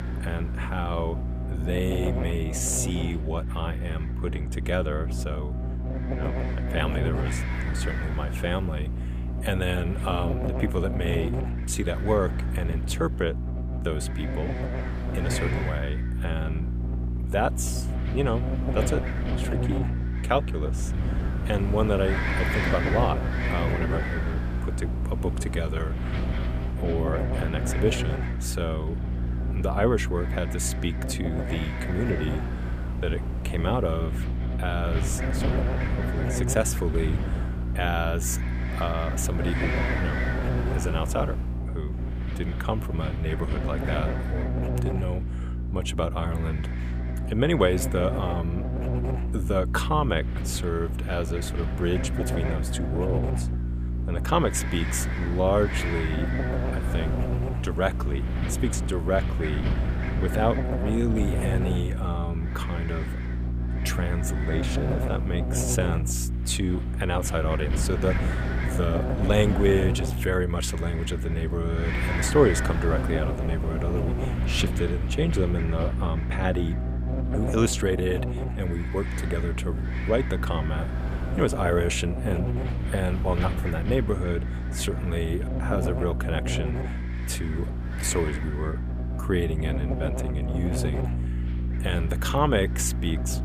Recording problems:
wind noise on the microphone; heavy; 7 dB below the speech
electrical hum; loud; throughout; 60 Hz, 8 dB below the speech

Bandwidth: 15 kHz